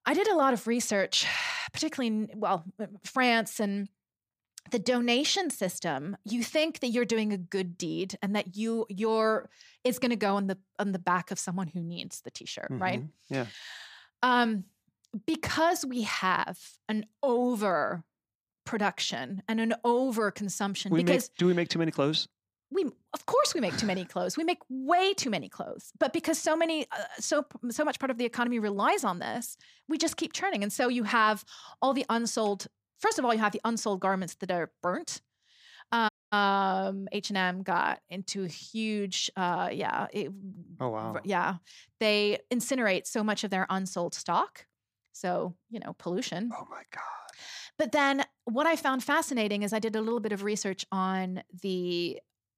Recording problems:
audio cutting out; at 36 s

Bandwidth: 15 kHz